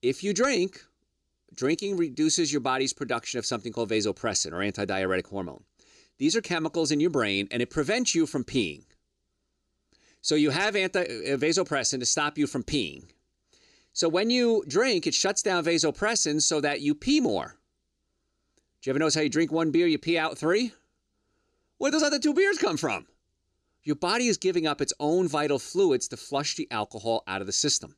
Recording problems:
none

